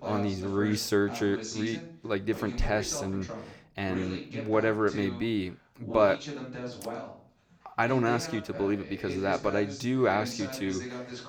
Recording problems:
voice in the background; loud; throughout; 9 dB below the speech

